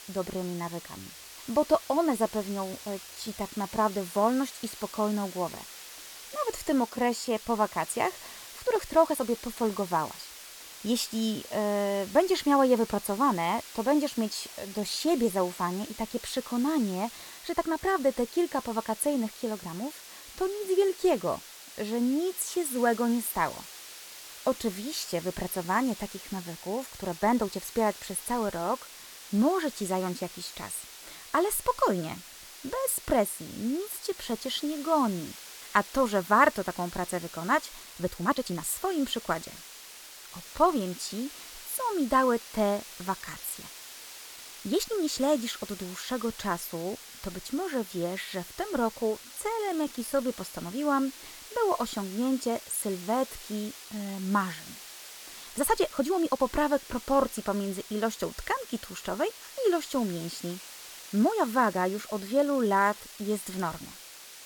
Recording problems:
hiss; noticeable; throughout; 15 dB below the speech
uneven, jittery; strongly; from 3 s to 1:03

